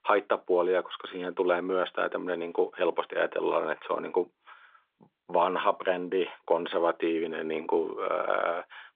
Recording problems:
phone-call audio; nothing above 3.5 kHz

